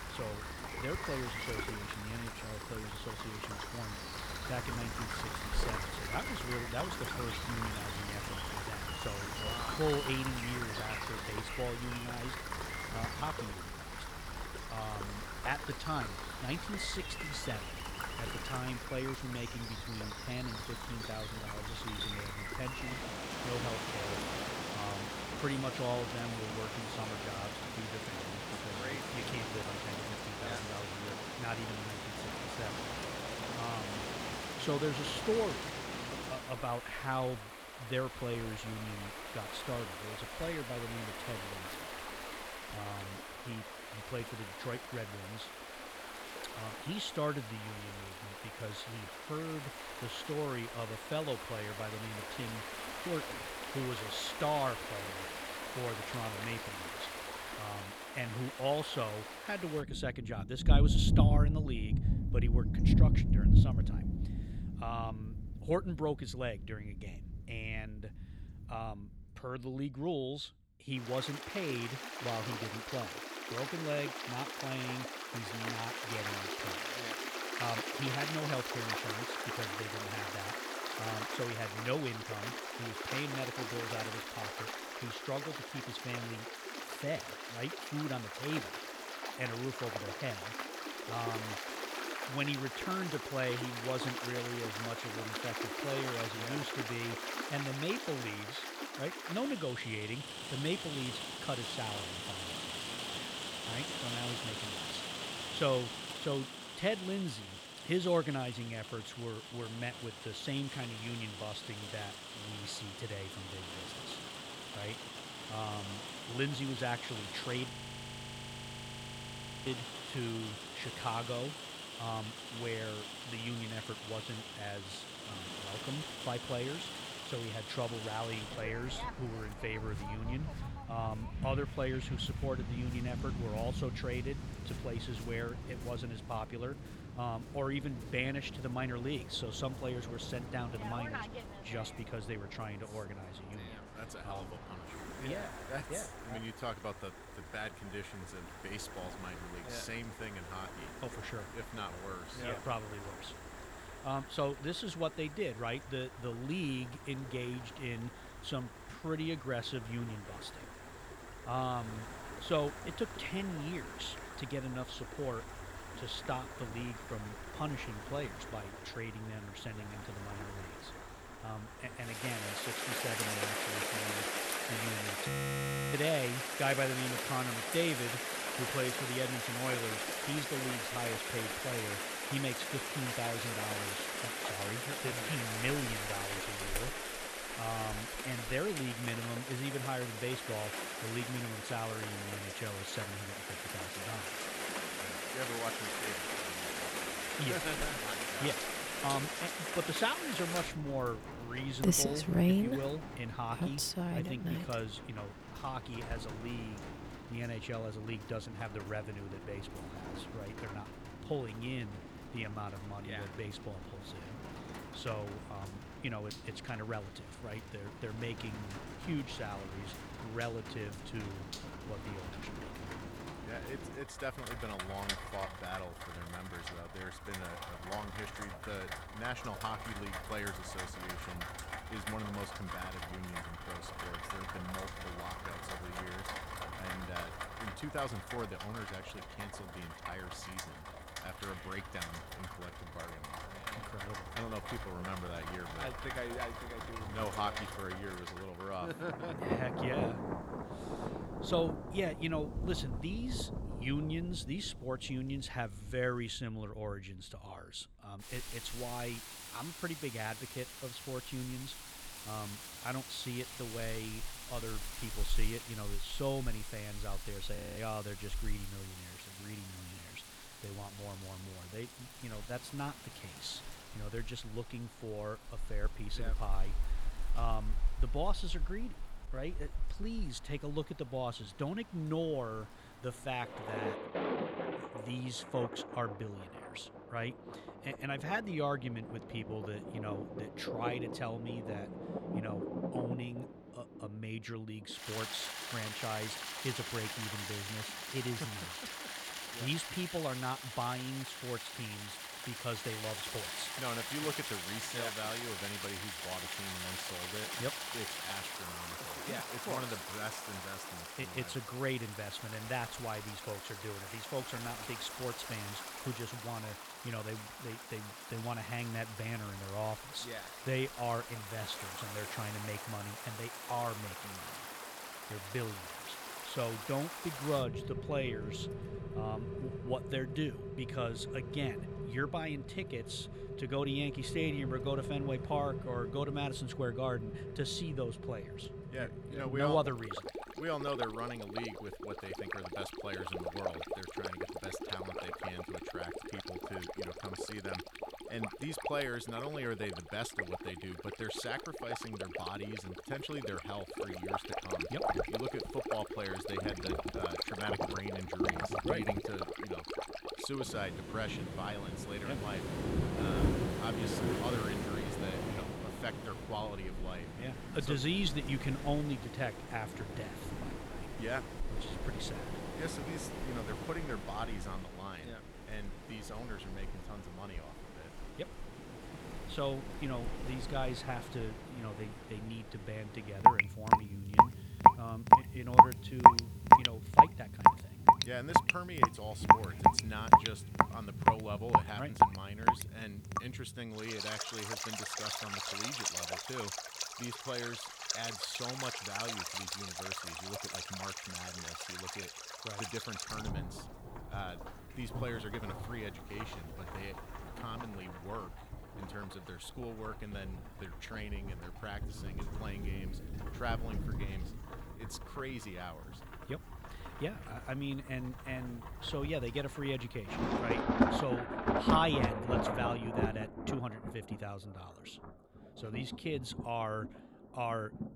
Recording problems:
rain or running water; very loud; throughout; 3 dB above the speech
audio freezing; at 1:58 for 2 s, at 2:55 for 0.5 s and at 4:28

